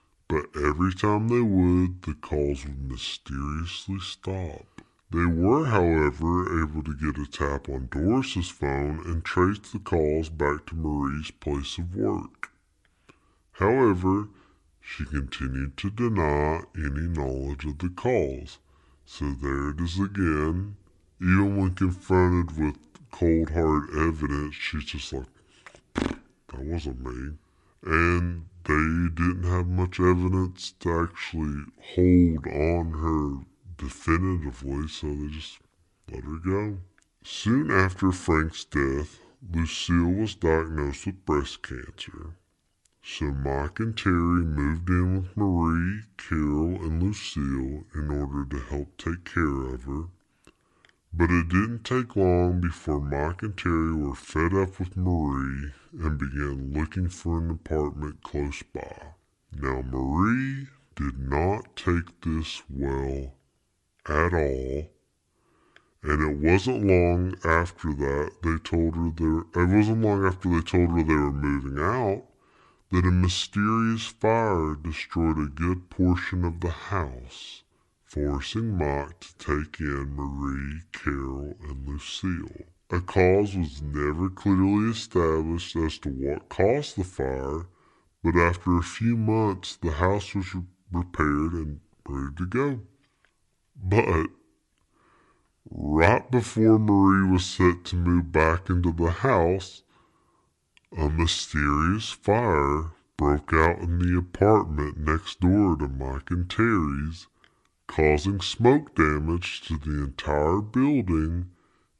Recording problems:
wrong speed and pitch; too slow and too low; 0.7 times normal speed

